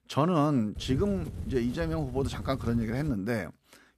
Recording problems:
wind noise on the microphone; occasional gusts; from 1 to 3 s; 20 dB below the speech

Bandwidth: 14.5 kHz